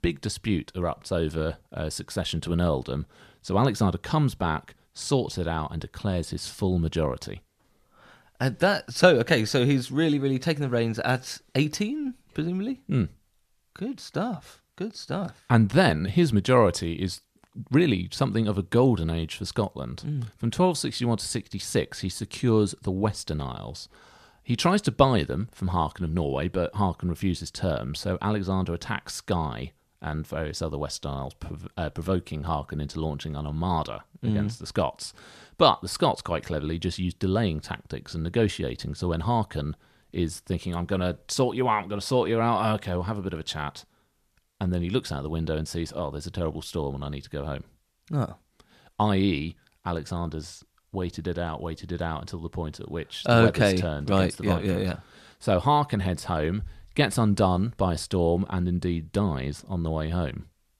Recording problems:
none

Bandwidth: 14.5 kHz